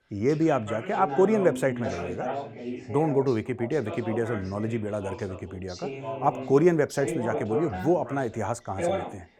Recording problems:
background chatter; loud; throughout; 2 voices, 8 dB below the speech

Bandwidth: 17 kHz